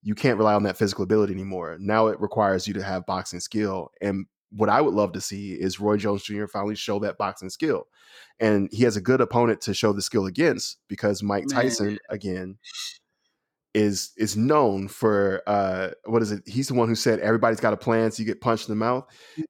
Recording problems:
none

